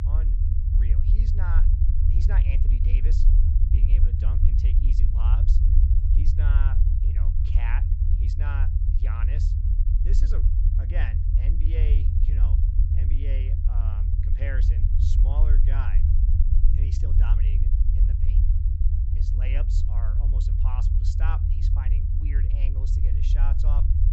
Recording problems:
high frequencies cut off; noticeable; nothing above 8 kHz
low rumble; loud; throughout; as loud as the speech

